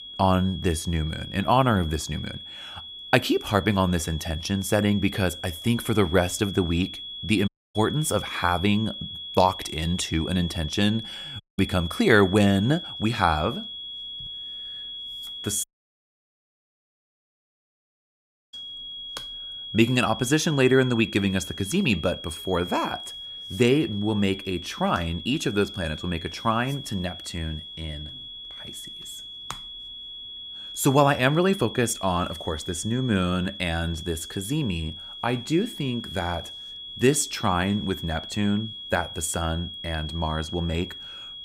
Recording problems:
high-pitched whine; noticeable; throughout; 3.5 kHz, 10 dB below the speech
audio cutting out; at 7.5 s, at 11 s and at 16 s for 3 s

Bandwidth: 15.5 kHz